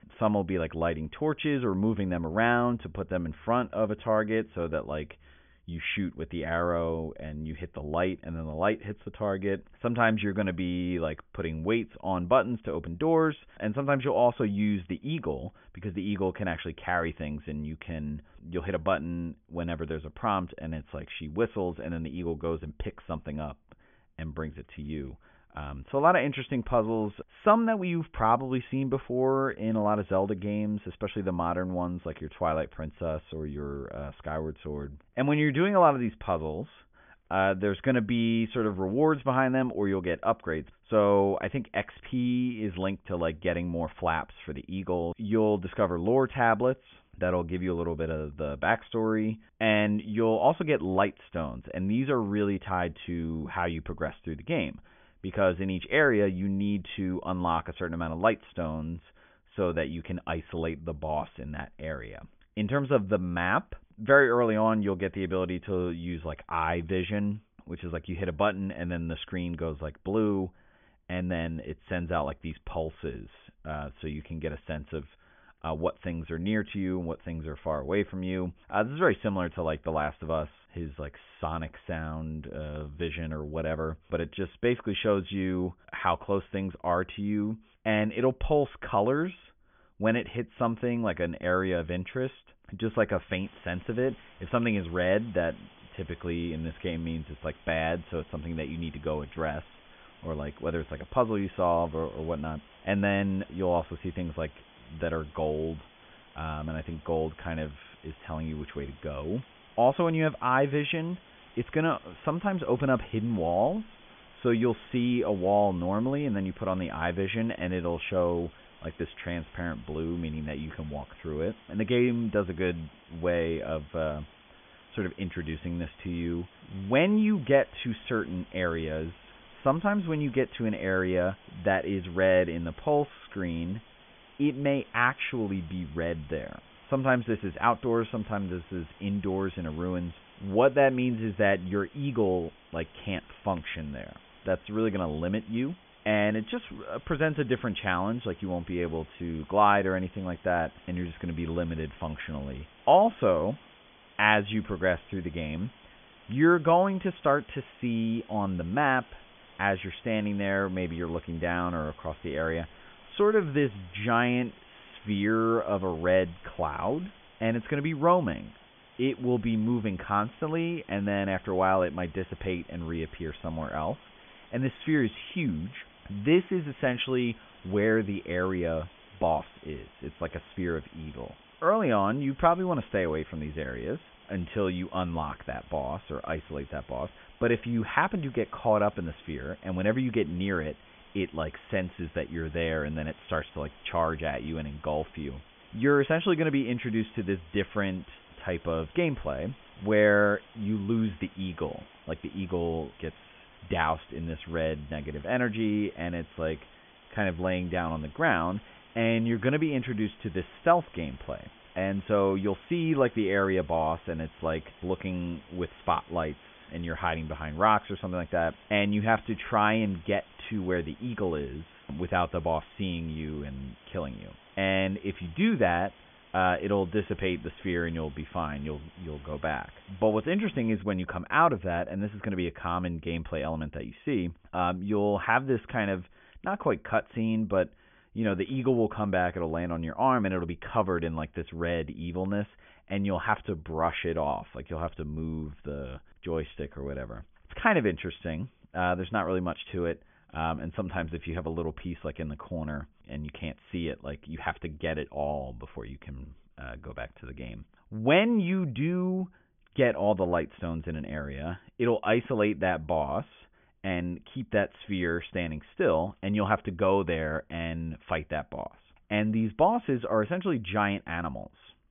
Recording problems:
high frequencies cut off; severe; nothing above 3.5 kHz
hiss; faint; from 1:33 to 3:51; 25 dB below the speech

